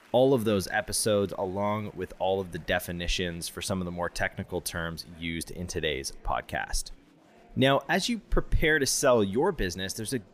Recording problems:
murmuring crowd; faint; throughout; 30 dB below the speech

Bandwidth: 15 kHz